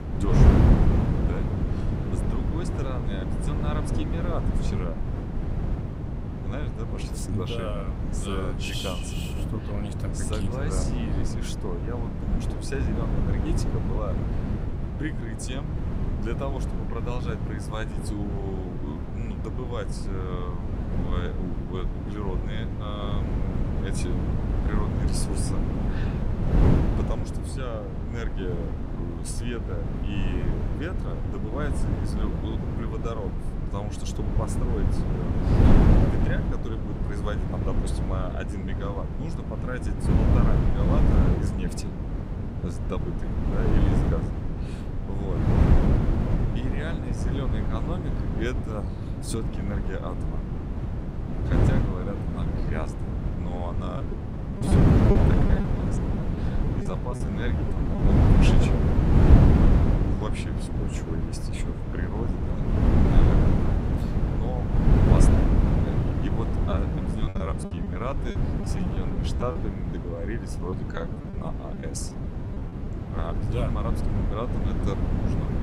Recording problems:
wind noise on the microphone; heavy; 3 dB above the speech
choppy; very; from 54 to 58 s, from 1:07 to 1:10 and from 1:11 to 1:13; 15% of the speech affected

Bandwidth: 15.5 kHz